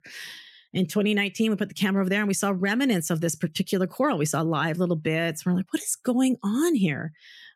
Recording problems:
none

